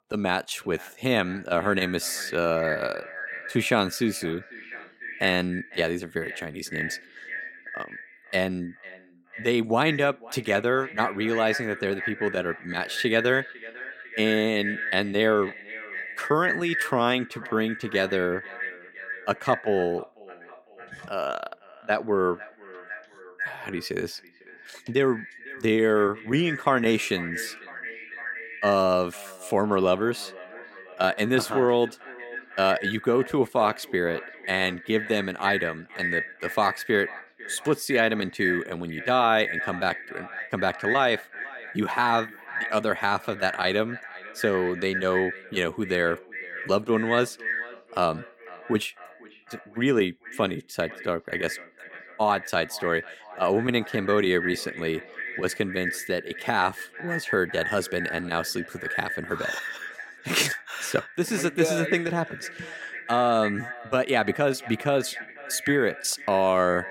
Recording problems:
echo of what is said; strong; throughout; 500 ms later, 9 dB below the speech

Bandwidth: 16.5 kHz